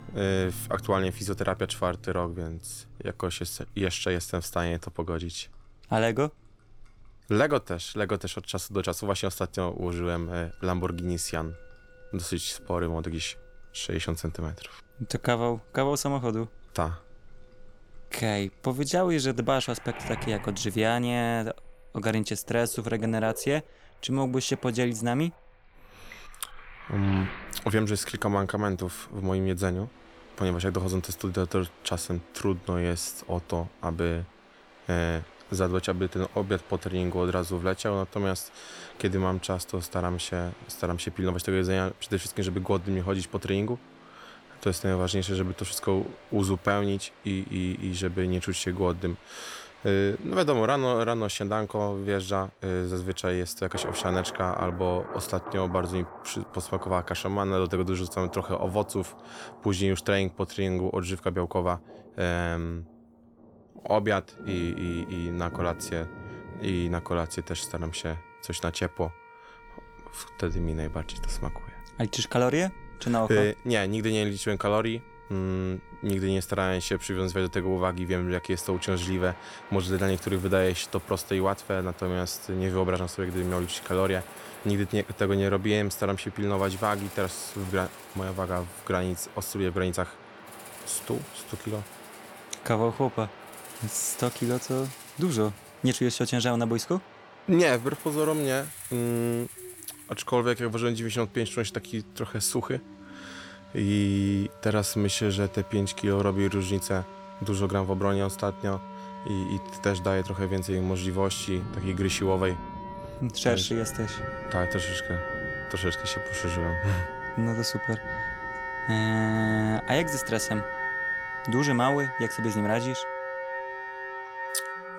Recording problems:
background music; loud; throughout; 10 dB below the speech
rain or running water; noticeable; throughout; 20 dB below the speech

